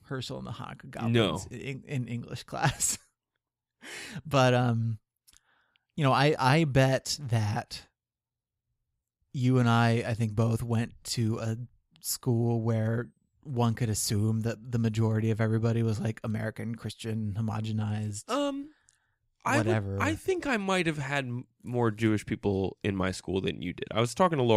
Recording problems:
abrupt cut into speech; at the end

